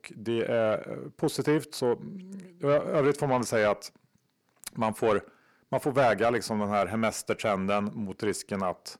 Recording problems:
distortion; slight; 10 dB below the speech

